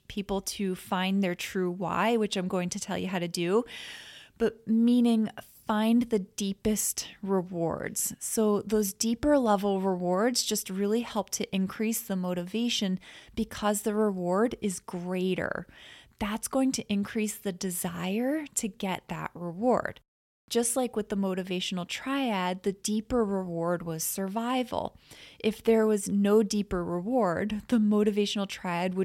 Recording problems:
abrupt cut into speech; at the end

